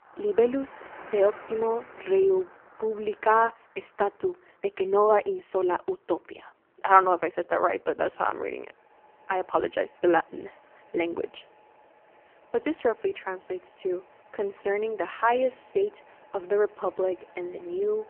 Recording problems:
phone-call audio; poor line
traffic noise; faint; throughout; 25 dB below the speech

